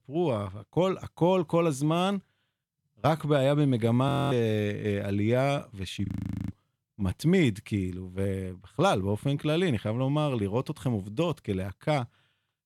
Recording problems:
audio freezing; at 4 s and at 6 s

